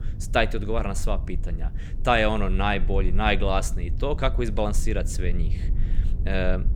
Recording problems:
low rumble; faint; throughout; 20 dB below the speech

